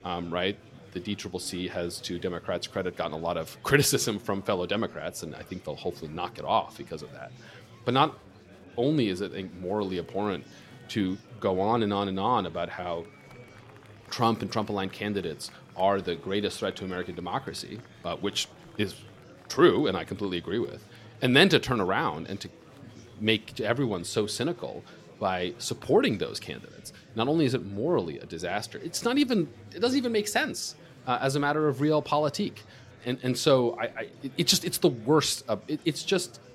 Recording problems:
murmuring crowd; faint; throughout; 25 dB below the speech

